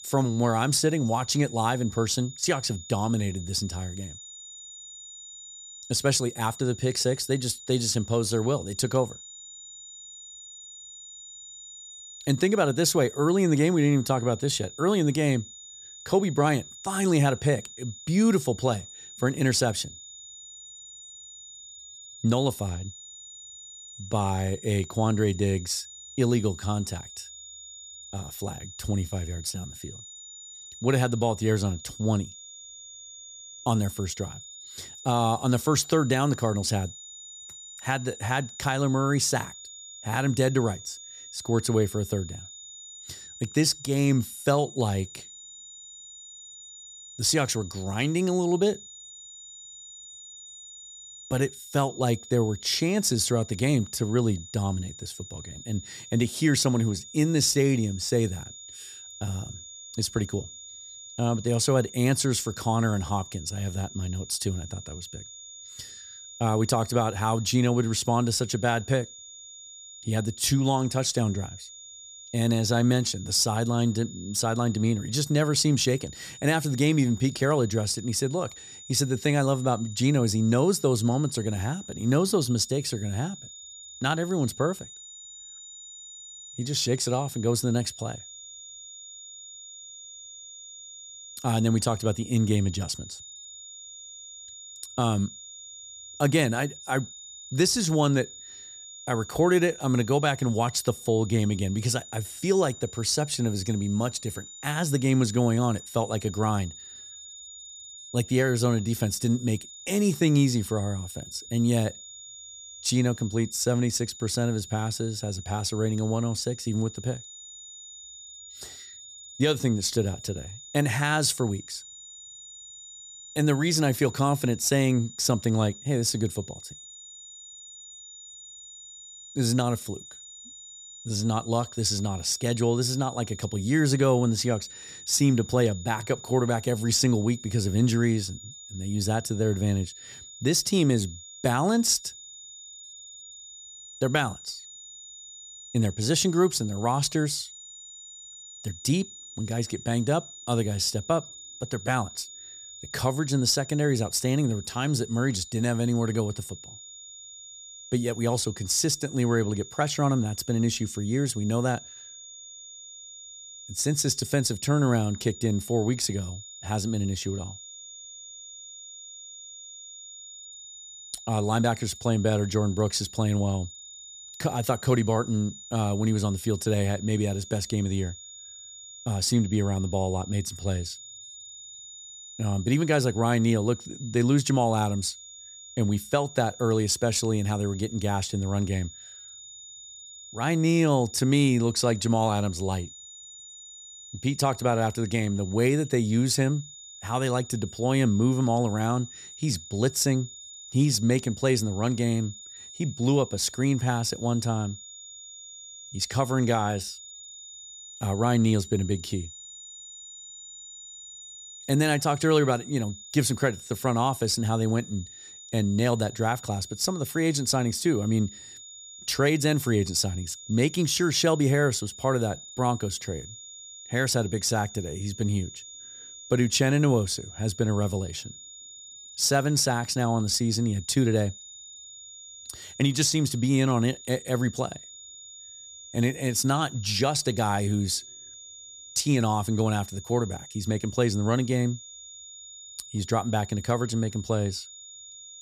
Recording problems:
high-pitched whine; noticeable; throughout; 7 kHz, 15 dB below the speech

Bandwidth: 14.5 kHz